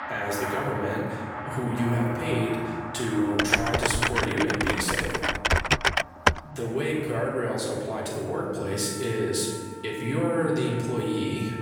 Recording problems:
off-mic speech; far
room echo; noticeable; dies away in 1.5 s
background music; noticeable; throughout; 10 dB below the speech
chatter from many people; faint; throughout; 30 dB below the speech
keyboard typing; loud; from 3.5 to 6.5 s; peak 6 dB above the speech

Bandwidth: 17.5 kHz